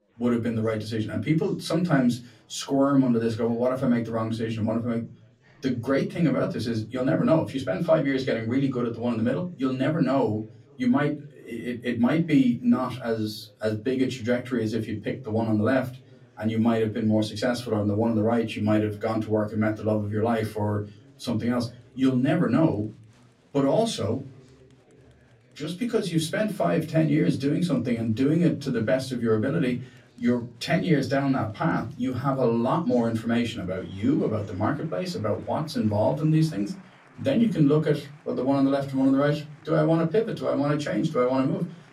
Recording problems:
off-mic speech; far
room echo; very slight; dies away in 0.3 s
chatter from many people; faint; throughout; 30 dB below the speech

